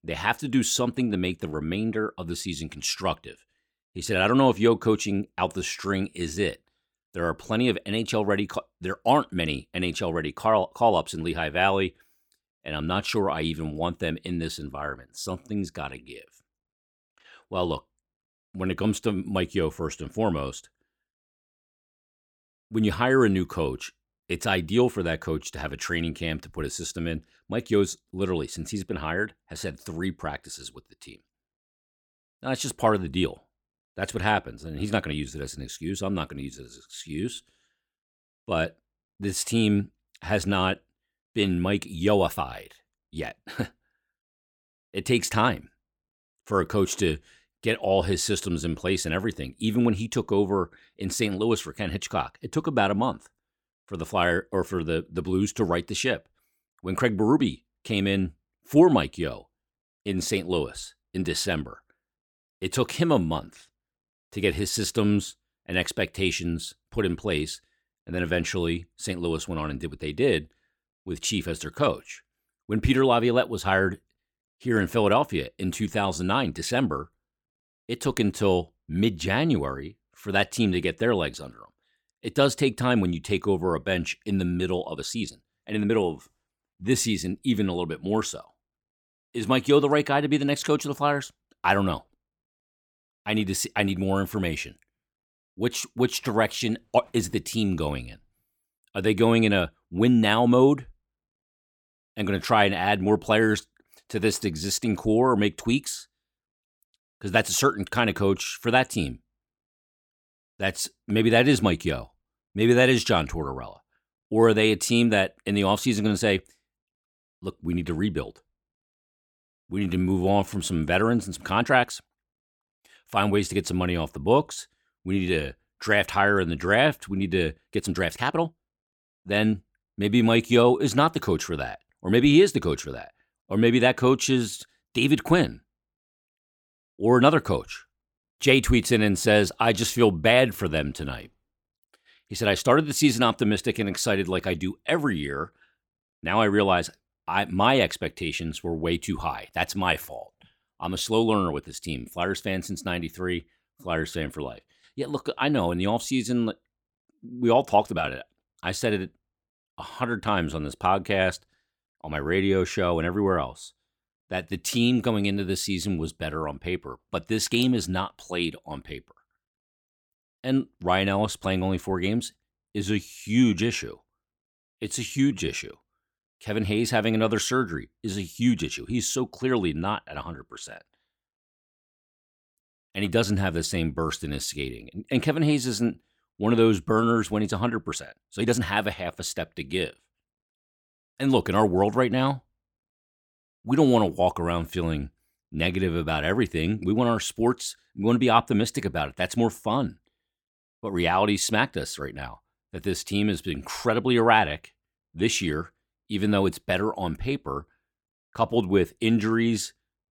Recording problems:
uneven, jittery; strongly; from 5.5 s to 3:09

